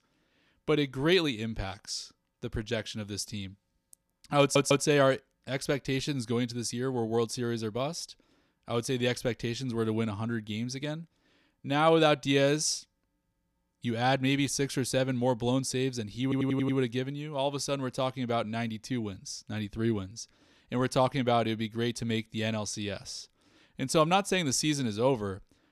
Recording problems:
audio stuttering; at 4.5 s and at 16 s

